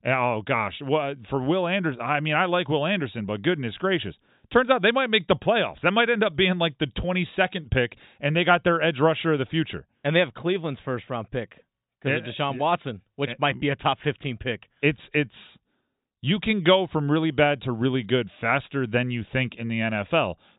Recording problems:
high frequencies cut off; severe; nothing above 4 kHz

